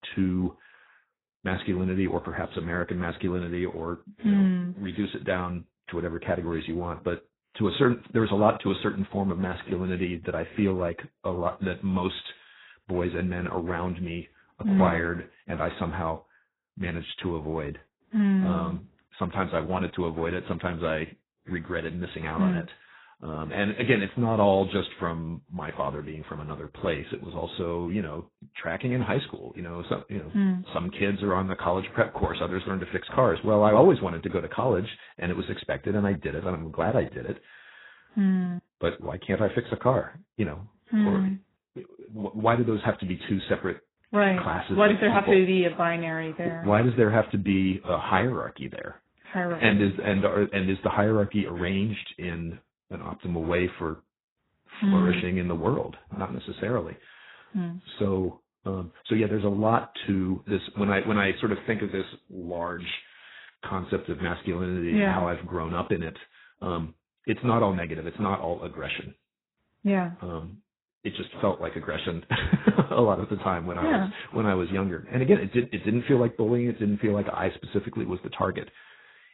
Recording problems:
garbled, watery; badly; nothing above 4 kHz

